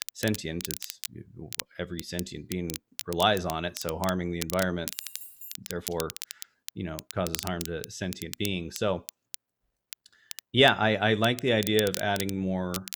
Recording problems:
crackle, like an old record; noticeable; 10 dB below the speech
jangling keys; faint; at 5 s; peak 15 dB below the speech

